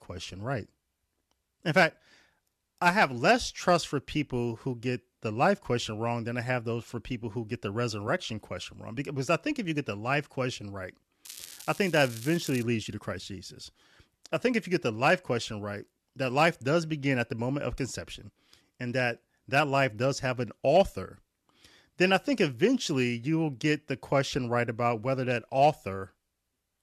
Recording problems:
crackling; noticeable; from 11 to 13 s; 15 dB below the speech

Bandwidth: 13.5 kHz